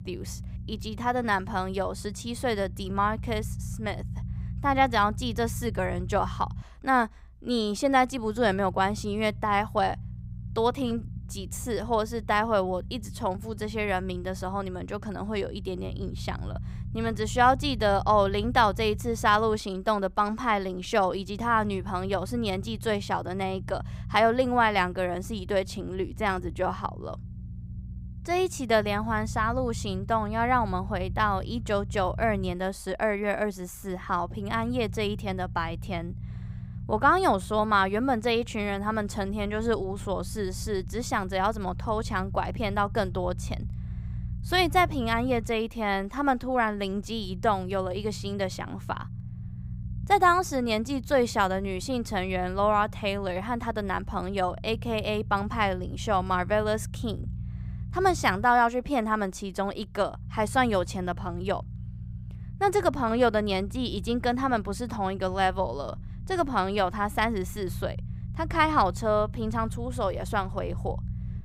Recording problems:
low rumble; faint; throughout; 25 dB below the speech

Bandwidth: 15.5 kHz